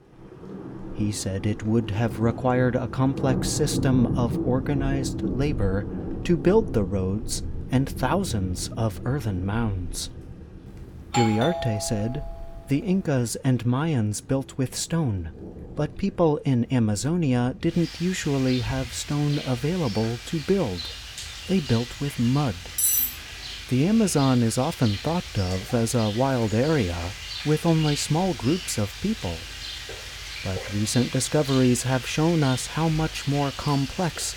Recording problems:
rain or running water; loud; throughout; 9 dB below the speech
doorbell; noticeable; from 11 to 12 s; peak 2 dB below the speech
clattering dishes; loud; at 23 s; peak 5 dB above the speech

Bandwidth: 18 kHz